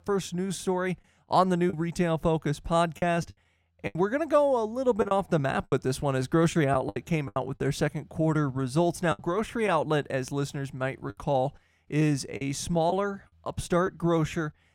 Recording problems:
choppy; very; 5% of the speech affected

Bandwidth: 16 kHz